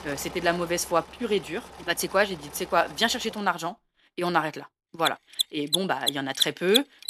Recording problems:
machinery noise; loud; throughout; 1 dB below the speech

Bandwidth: 13.5 kHz